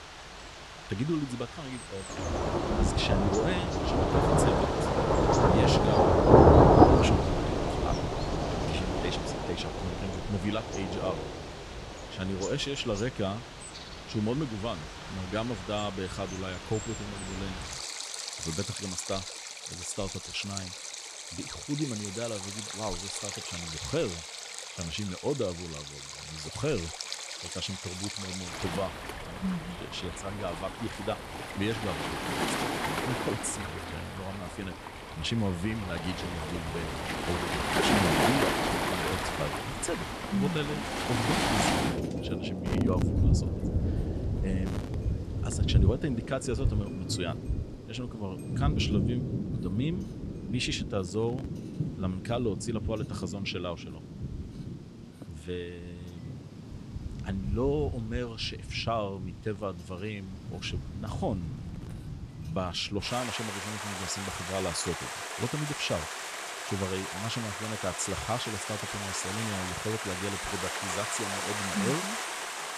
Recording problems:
rain or running water; very loud; throughout; 4 dB above the speech

